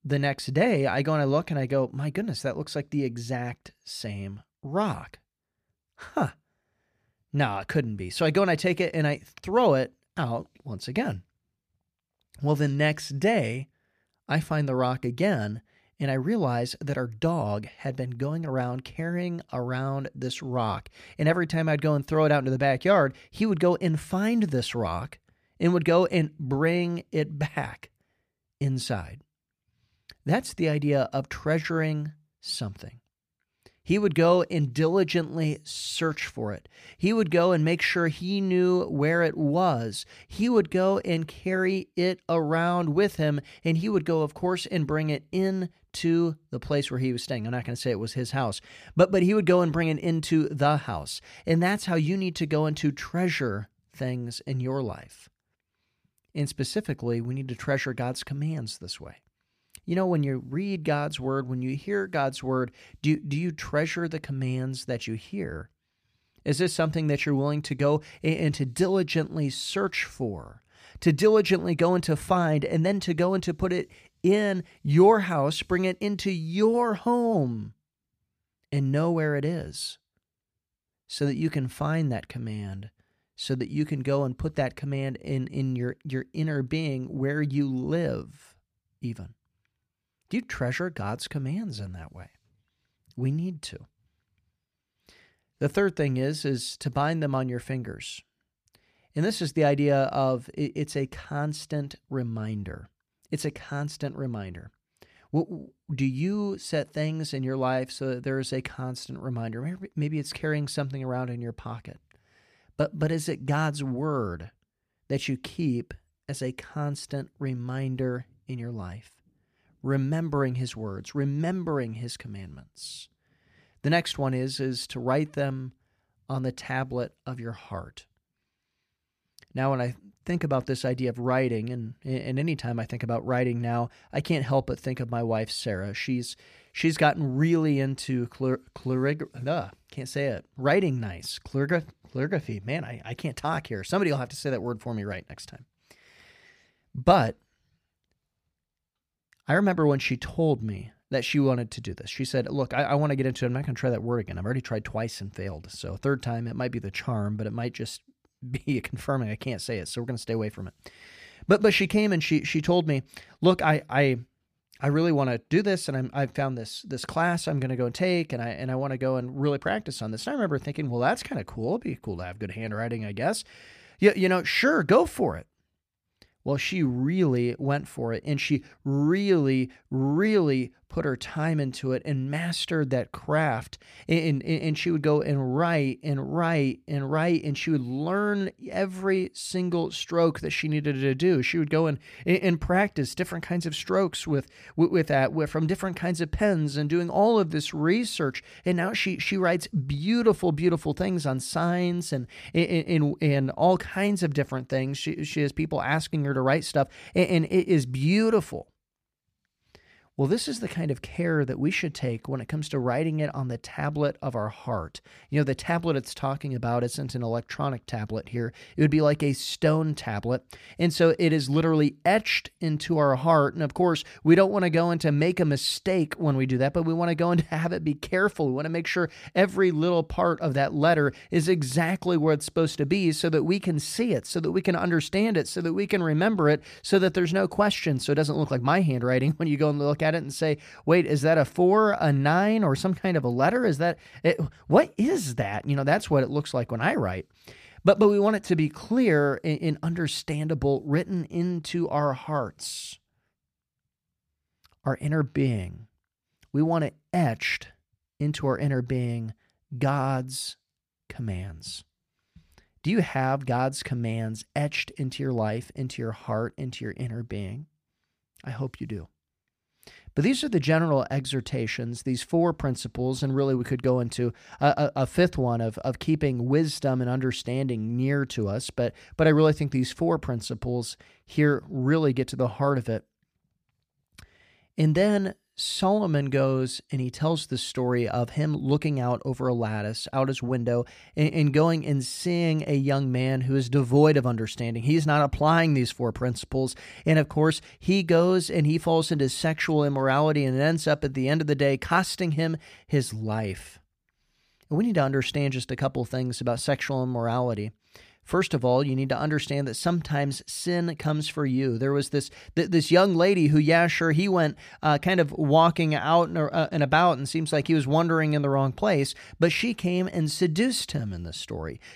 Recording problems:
none

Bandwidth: 15 kHz